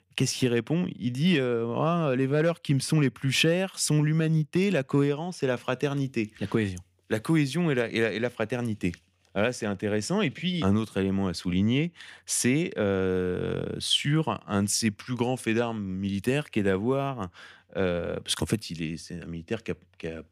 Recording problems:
none

